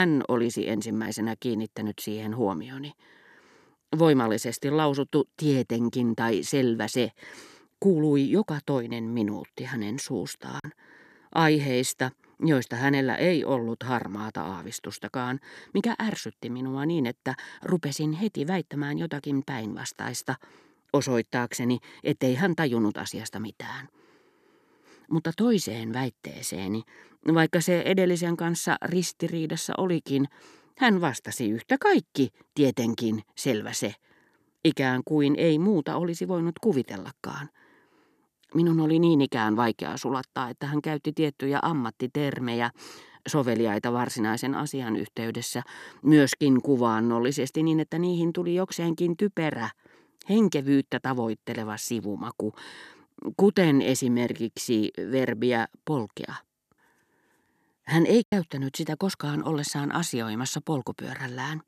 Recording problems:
abrupt cut into speech; at the start
choppy; occasionally; at 11 s and at 58 s; 3% of the speech affected

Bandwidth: 14 kHz